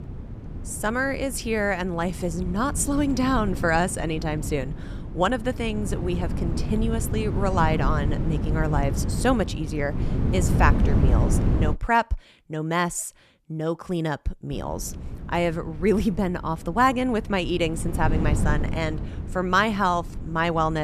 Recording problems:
wind noise on the microphone; occasional gusts; until 12 s and from 15 s on; 10 dB below the speech
abrupt cut into speech; at the end

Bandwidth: 14 kHz